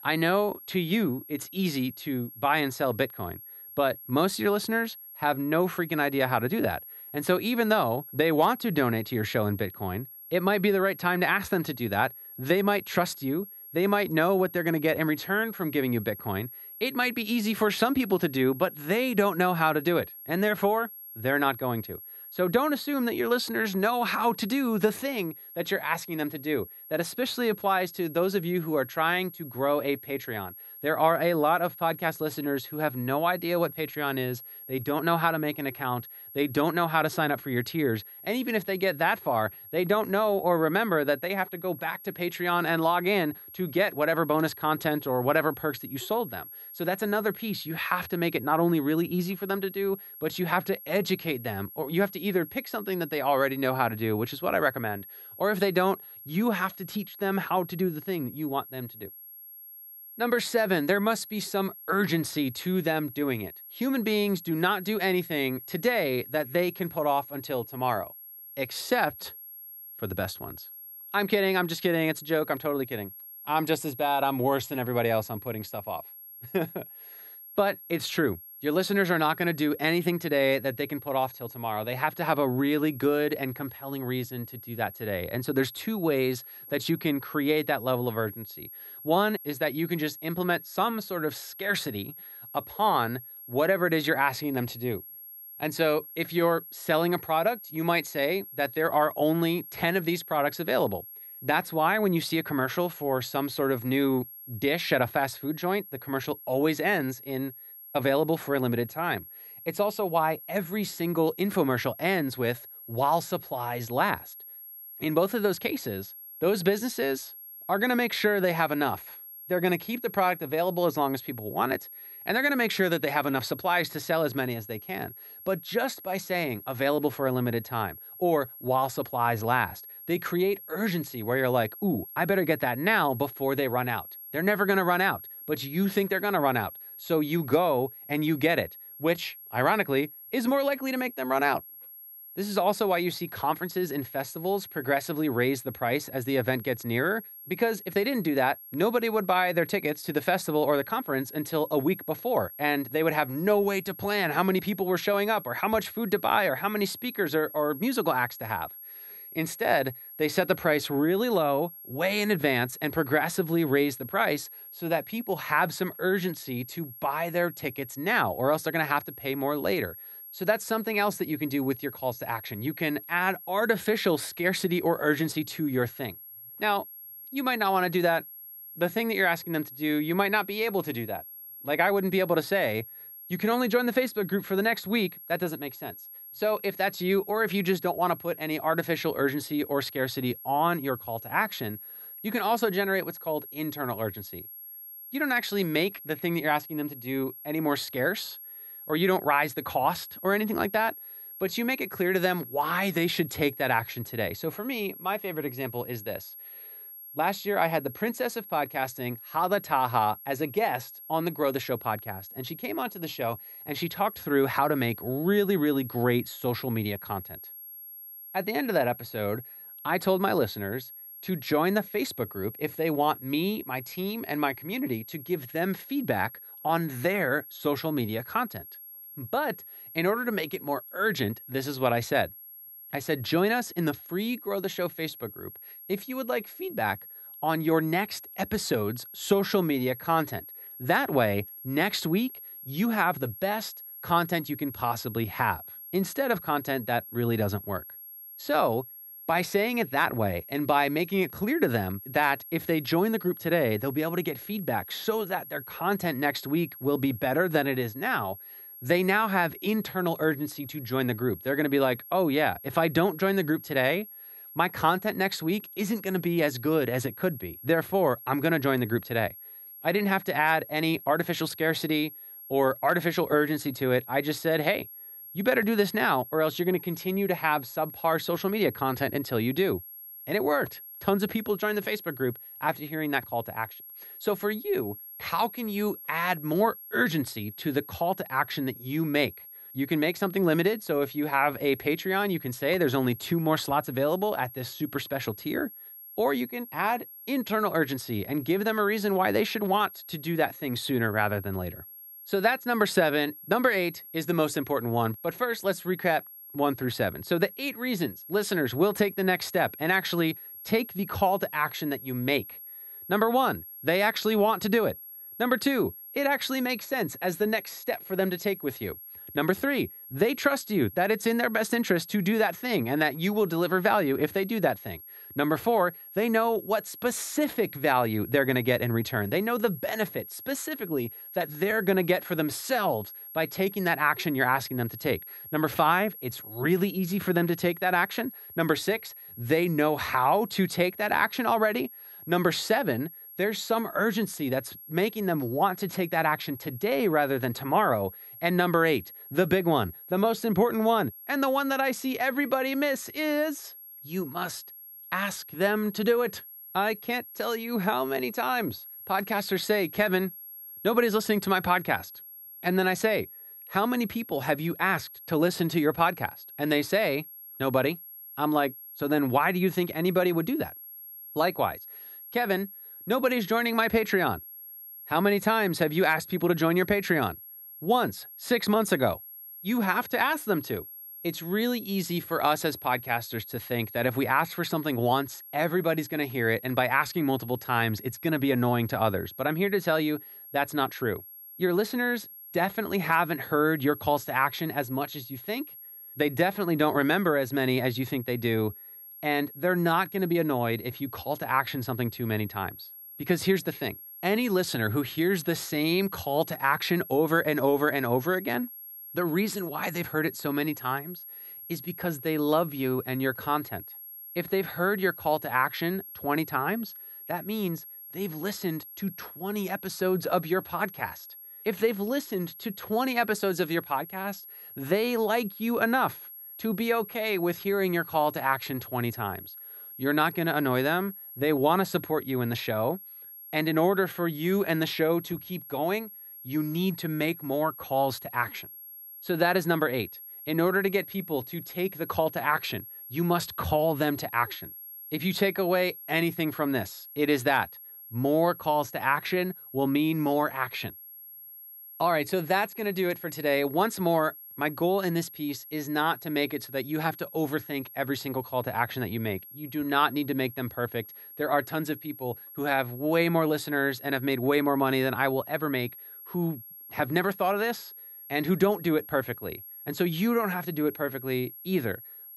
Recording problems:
high-pitched whine; noticeable; throughout; 11.5 kHz, 15 dB below the speech

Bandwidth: 15.5 kHz